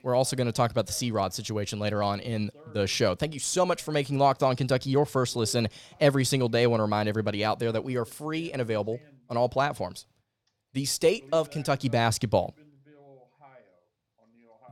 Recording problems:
voice in the background; faint; throughout; 30 dB below the speech

